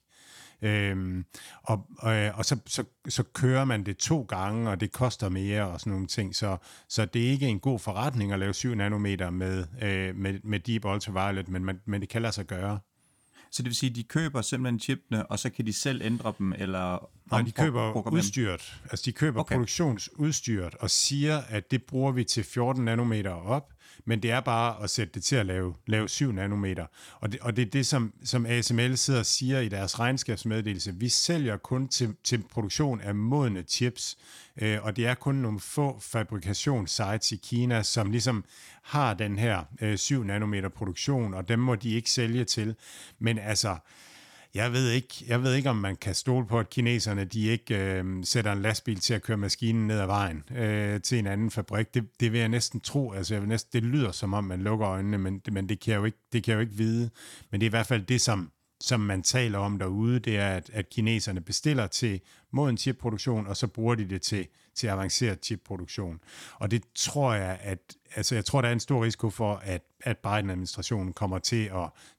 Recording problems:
none

